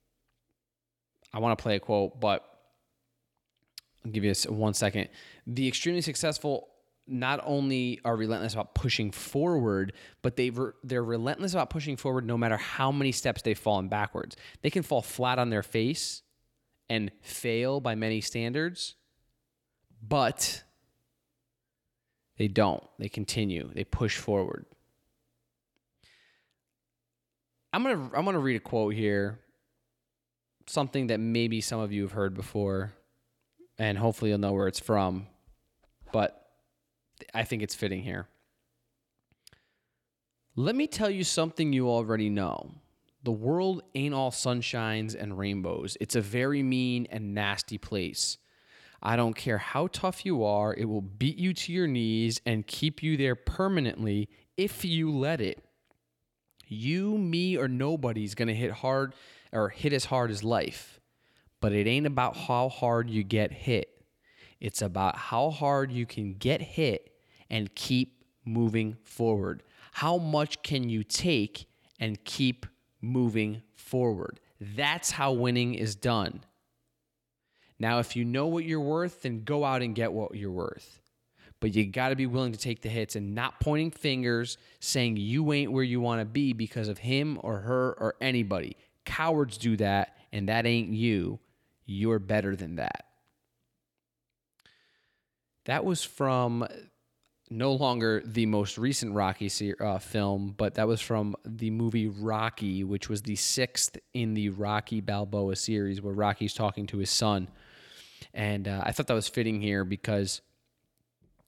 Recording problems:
none

